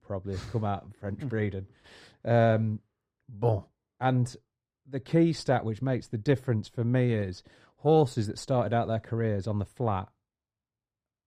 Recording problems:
muffled; slightly; fading above 1.5 kHz

